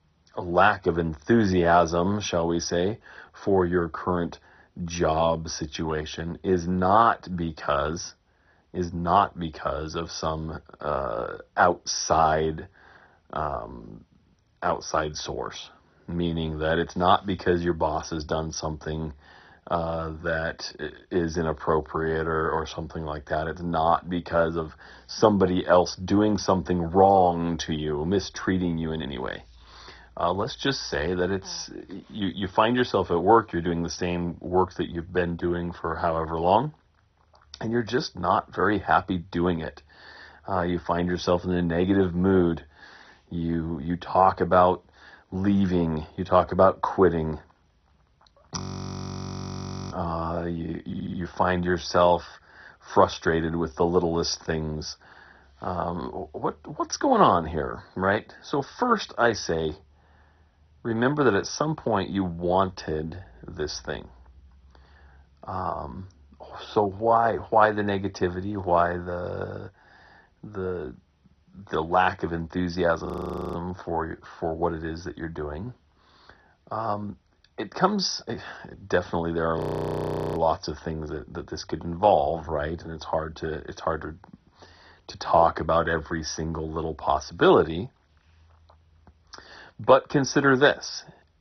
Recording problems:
garbled, watery; badly; nothing above 6 kHz
audio freezing; at 49 s for 1.5 s, at 1:13 and at 1:20 for 1 s
audio stuttering; at 51 s

